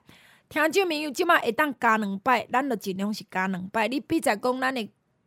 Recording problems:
none

